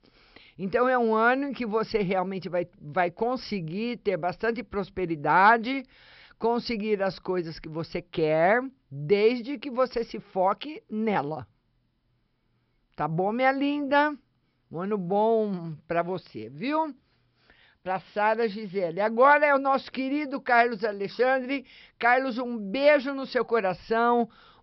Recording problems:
high frequencies cut off; noticeable; nothing above 5.5 kHz

